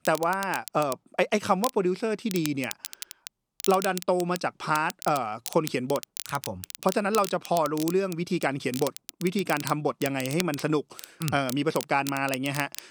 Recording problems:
crackle, like an old record; noticeable; 10 dB below the speech

